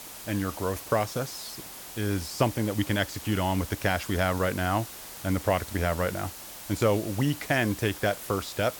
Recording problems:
hiss; noticeable; throughout; 10 dB below the speech

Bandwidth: 18 kHz